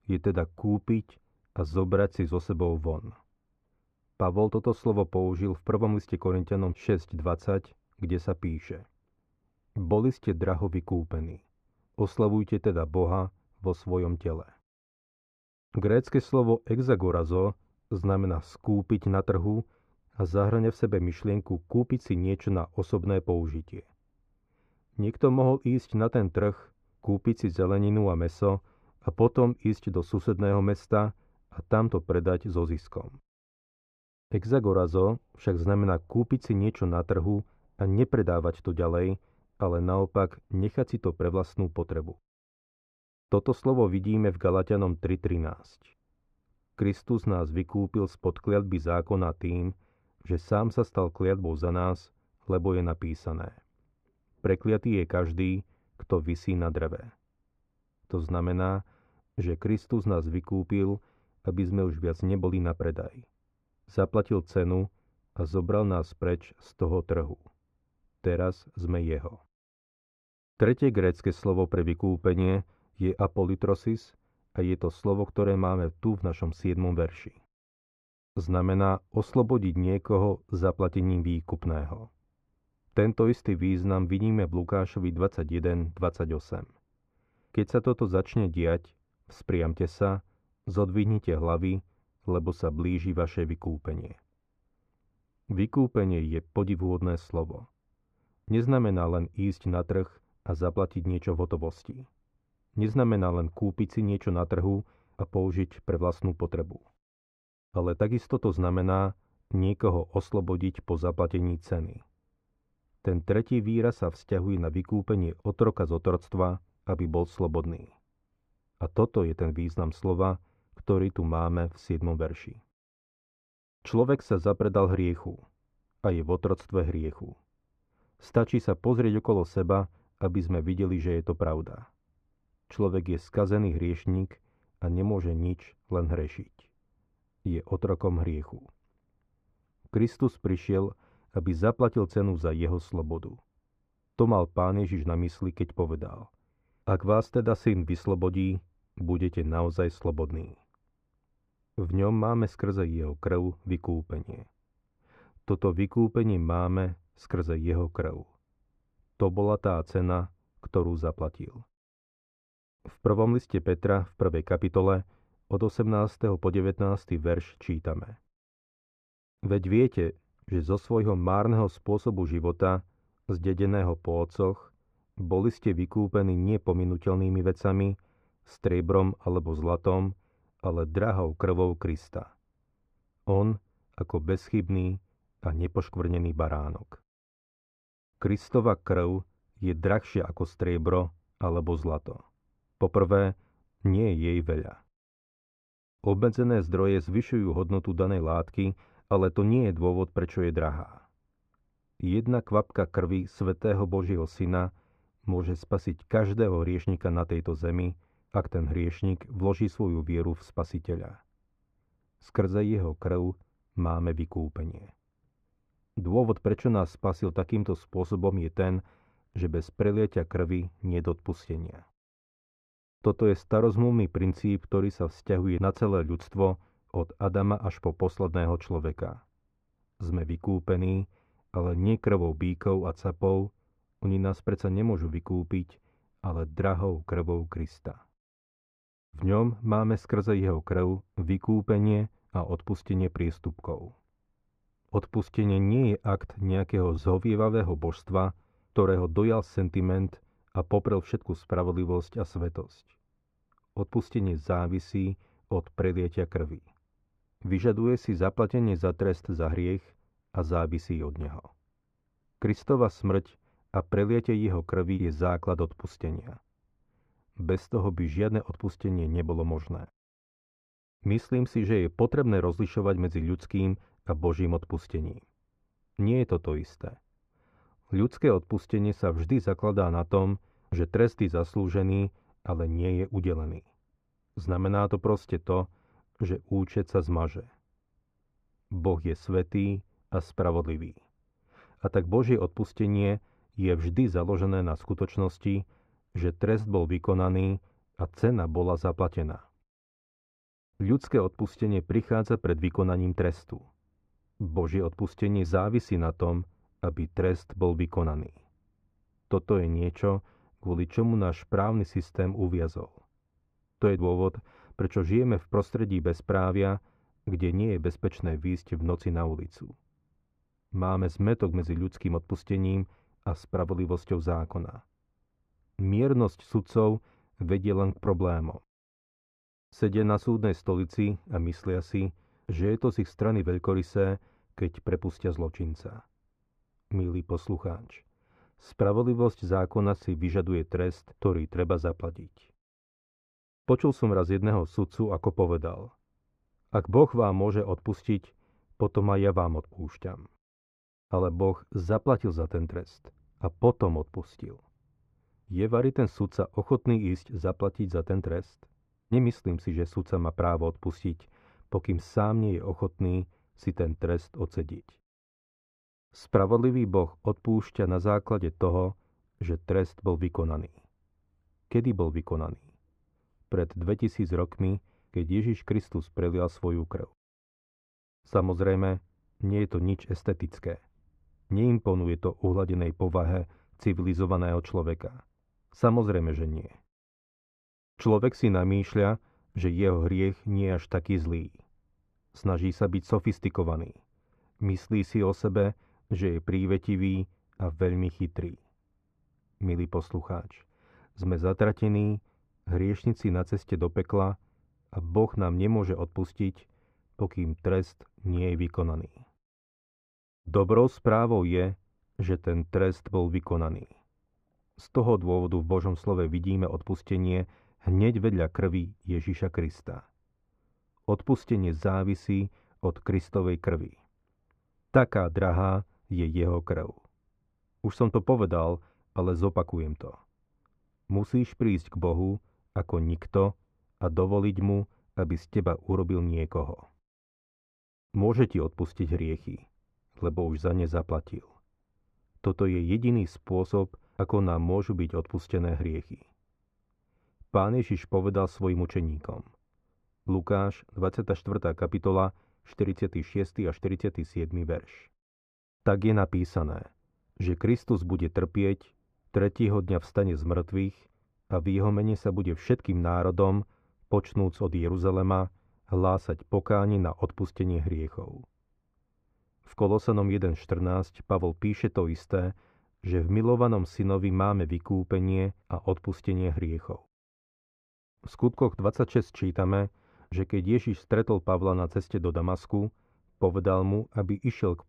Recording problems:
muffled; very; fading above 3.5 kHz

